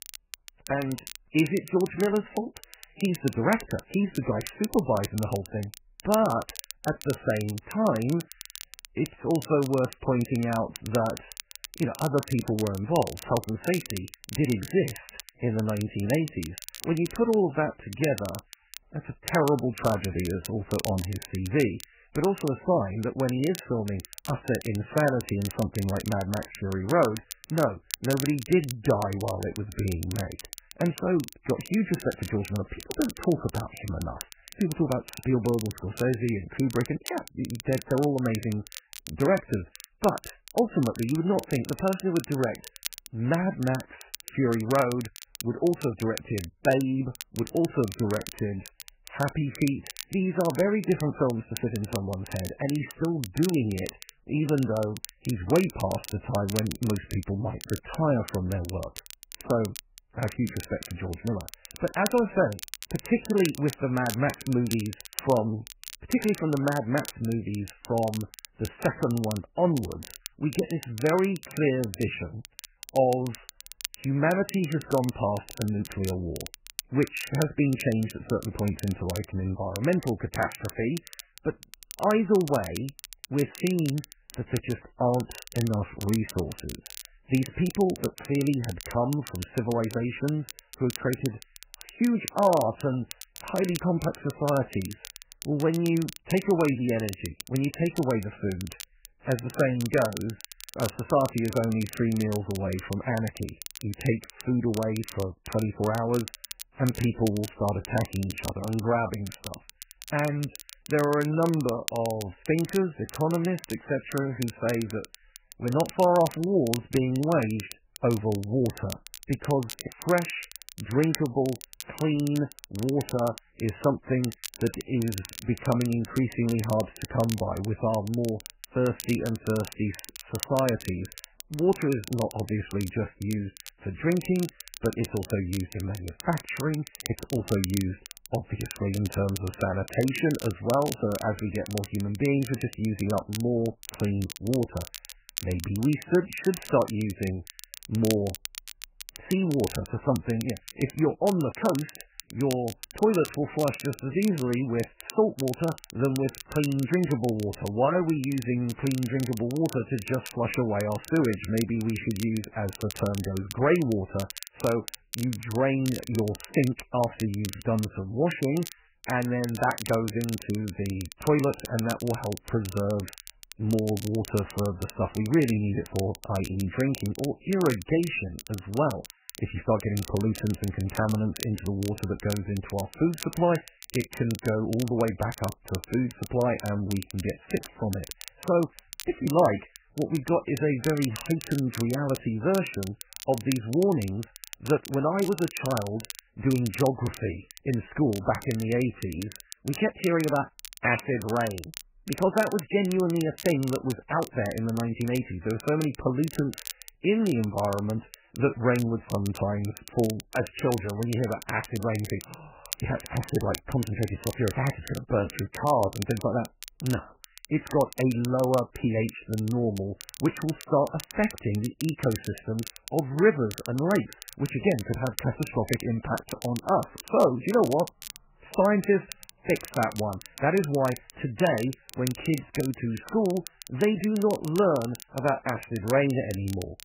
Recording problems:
garbled, watery; badly; nothing above 3 kHz
crackle, like an old record; noticeable; 15 dB below the speech

